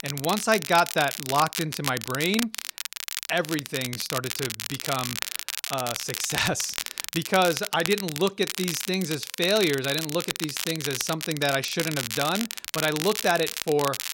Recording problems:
crackle, like an old record; loud; 5 dB below the speech

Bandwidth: 16 kHz